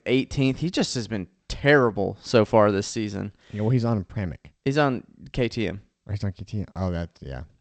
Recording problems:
garbled, watery; slightly; nothing above 8 kHz

